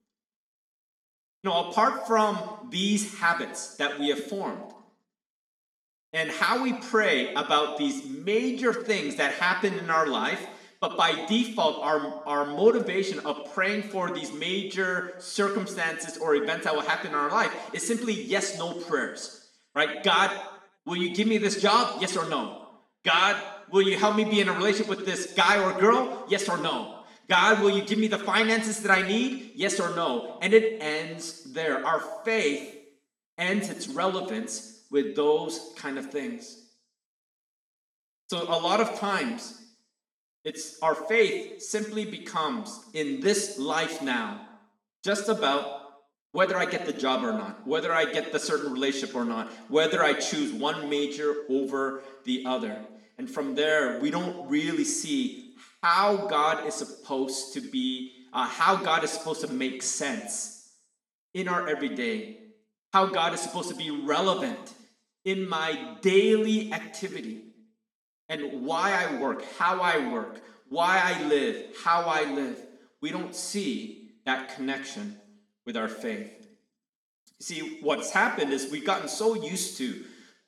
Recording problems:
room echo; slight; dies away in 0.7 s
off-mic speech; somewhat distant

